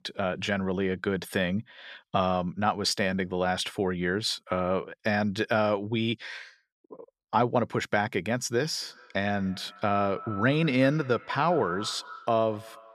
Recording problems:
echo of what is said; noticeable; from 9 s on; 190 ms later, 15 dB below the speech

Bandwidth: 14.5 kHz